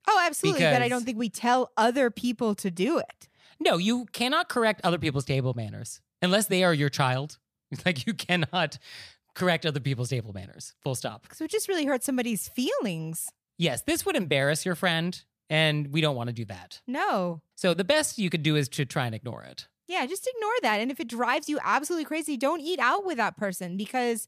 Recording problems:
none

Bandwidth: 14.5 kHz